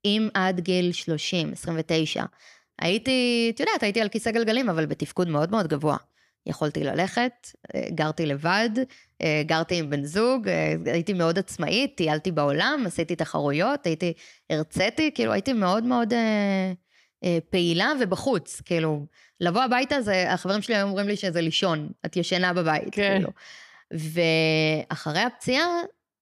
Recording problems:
none

